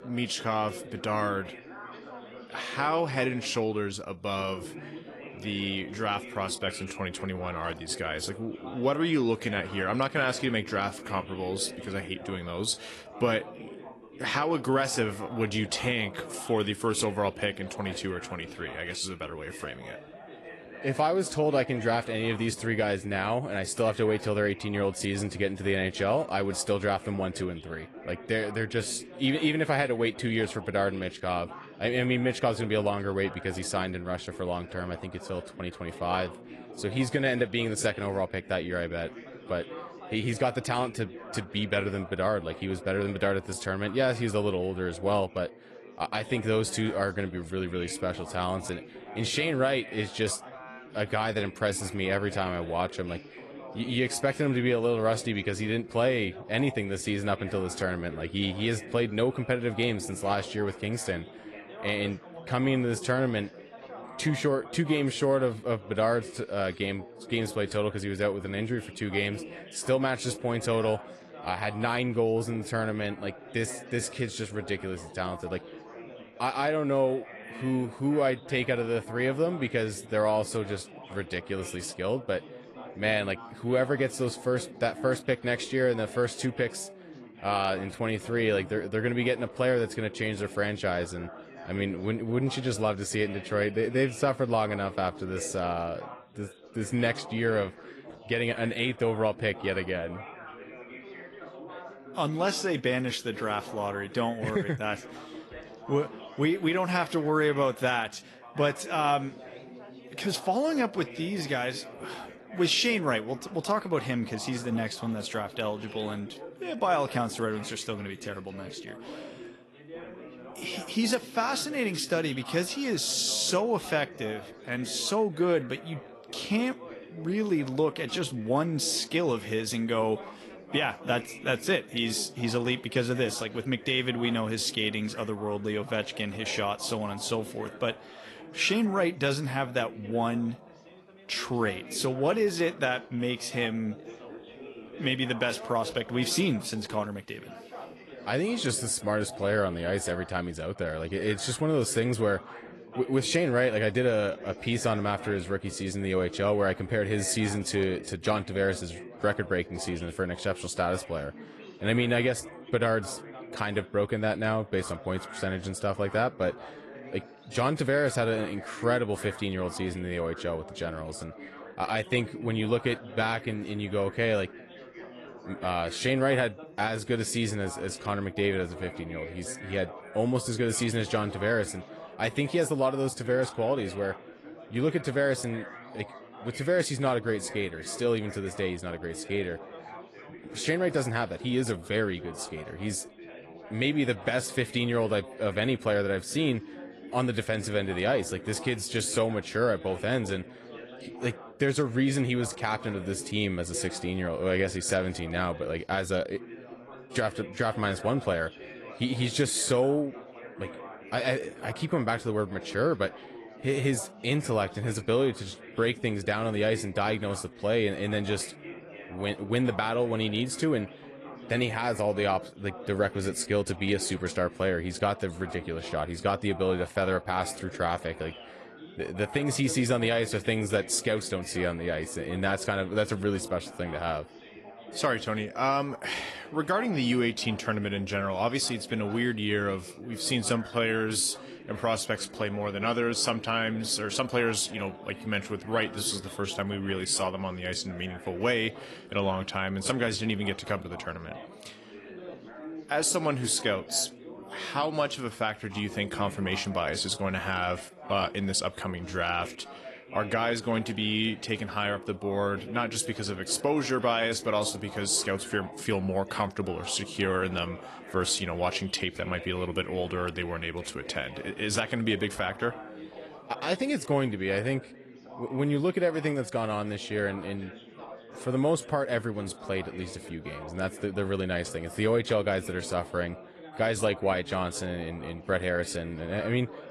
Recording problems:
garbled, watery; slightly; nothing above 11 kHz
background chatter; noticeable; throughout; 4 voices, 15 dB below the speech

